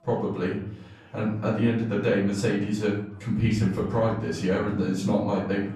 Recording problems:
off-mic speech; far
room echo; noticeable; dies away in 0.7 s
chatter from many people; faint; throughout; 25 dB below the speech

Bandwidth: 14 kHz